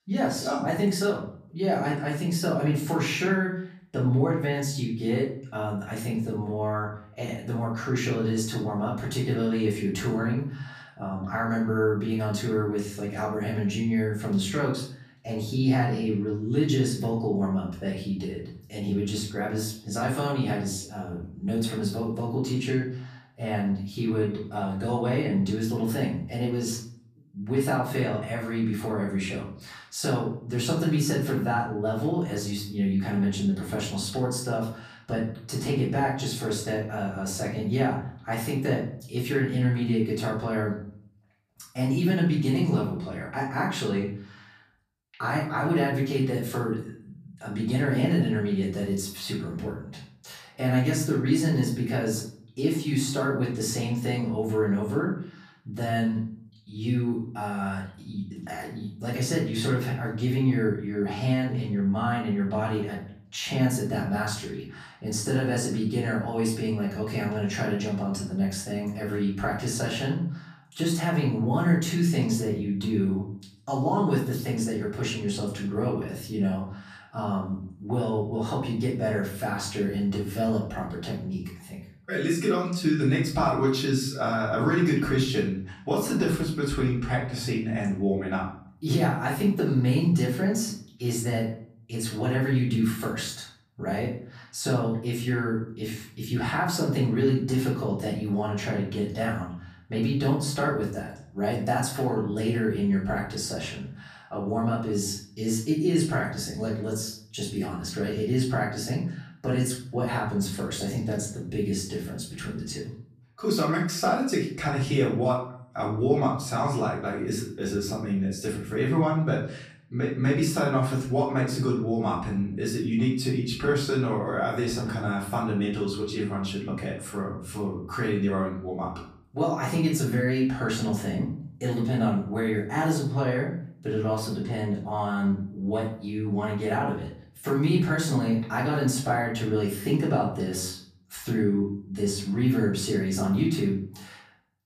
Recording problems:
off-mic speech; far
room echo; noticeable; dies away in 0.5 s

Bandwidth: 14.5 kHz